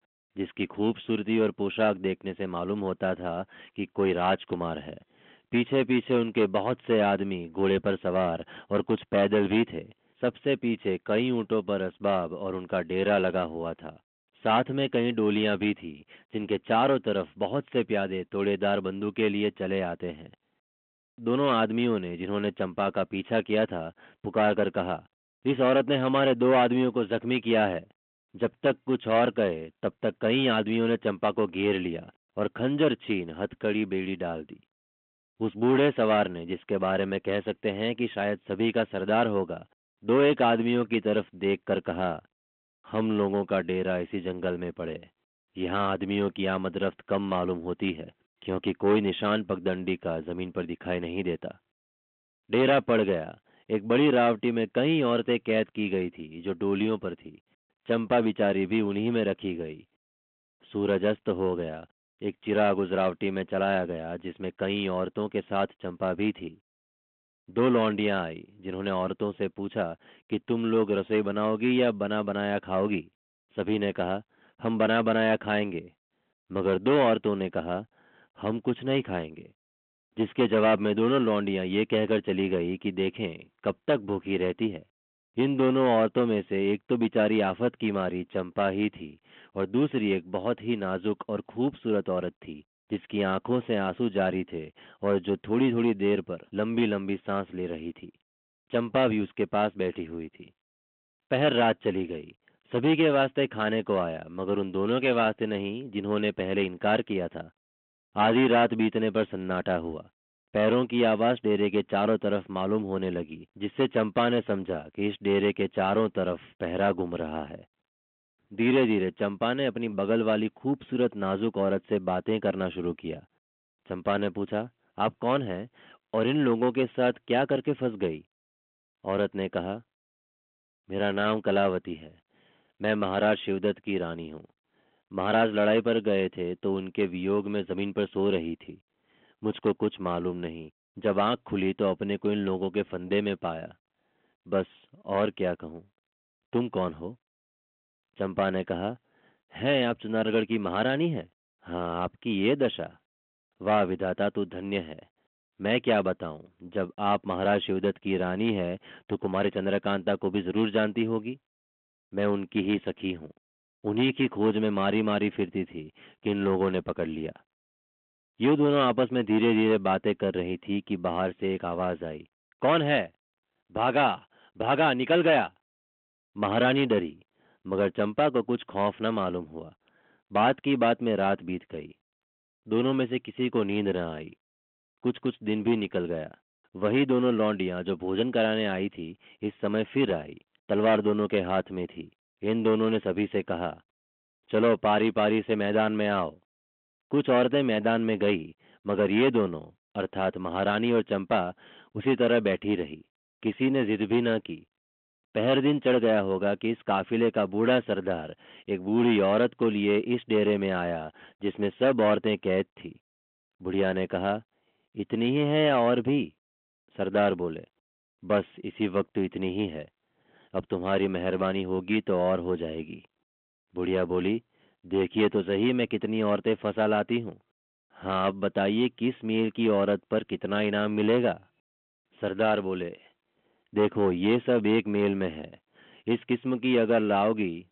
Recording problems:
phone-call audio
distortion; slight; 10 dB below the speech

